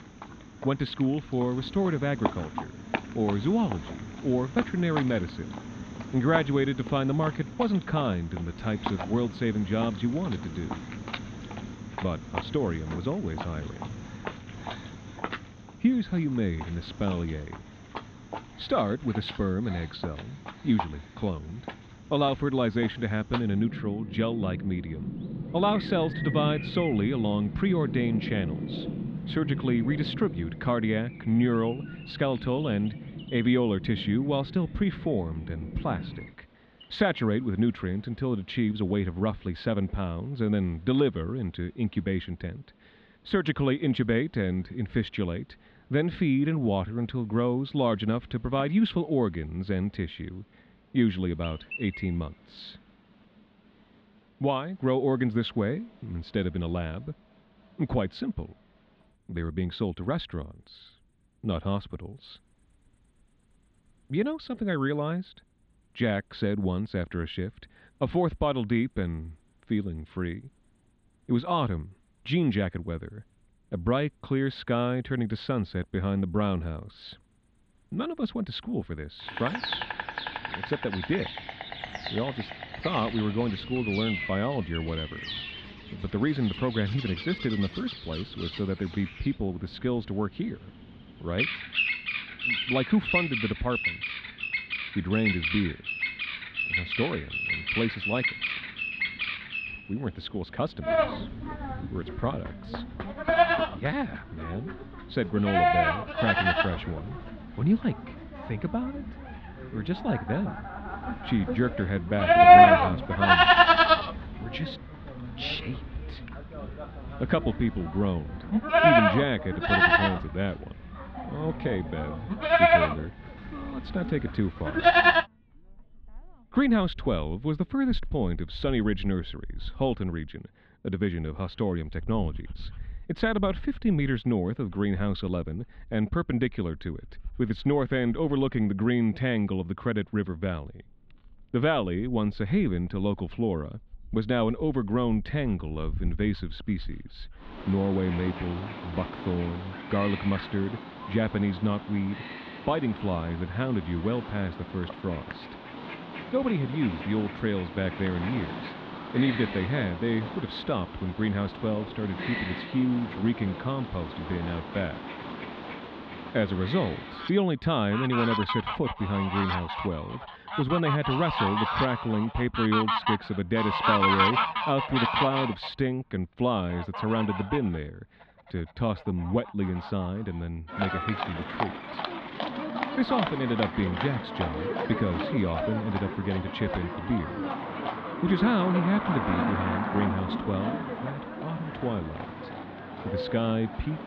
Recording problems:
muffled; slightly; fading above 3.5 kHz
animal sounds; loud; throughout; as loud as the speech

